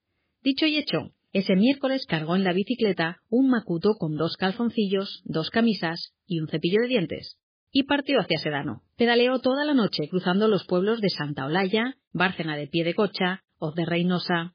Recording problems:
garbled, watery; badly

